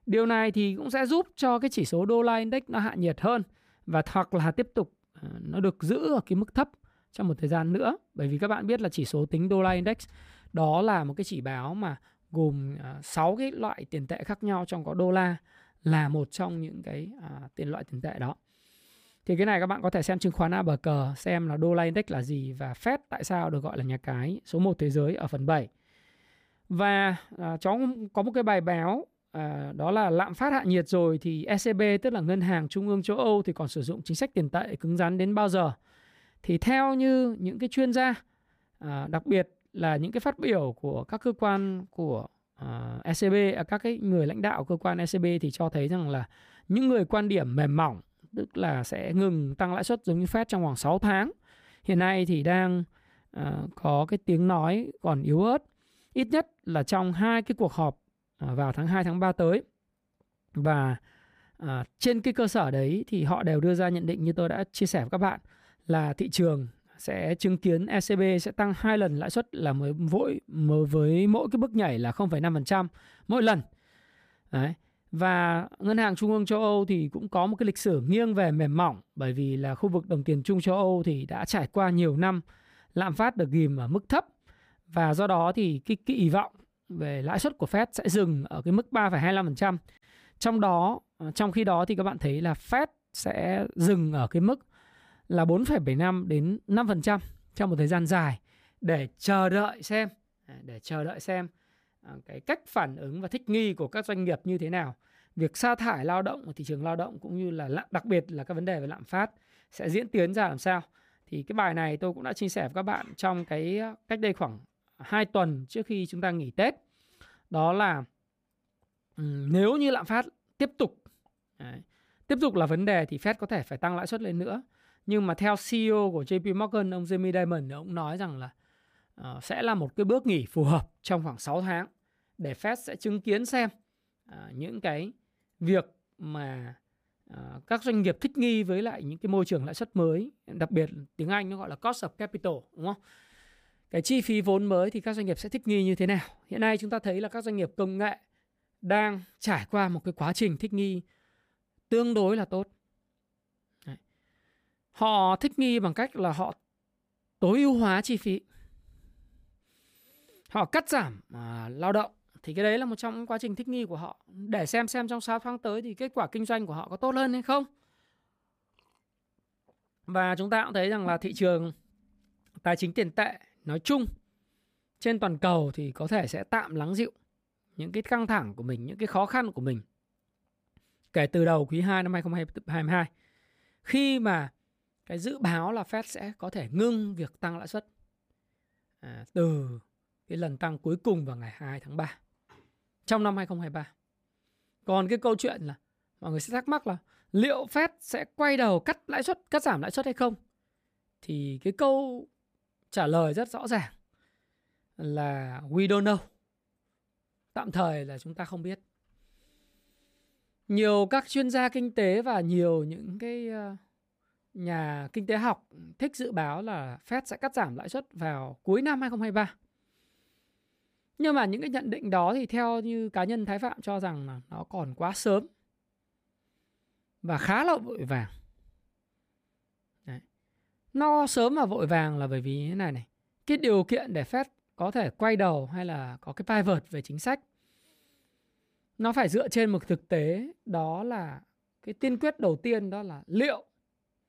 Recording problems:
none

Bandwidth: 15 kHz